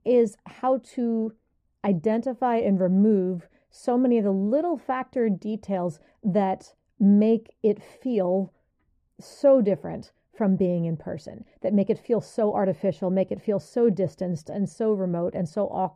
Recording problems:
muffled; very; fading above 1.5 kHz

